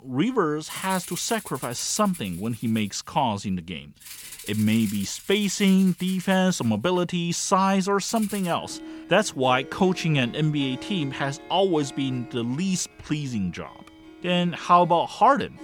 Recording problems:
background music; noticeable; throughout; 15 dB below the speech

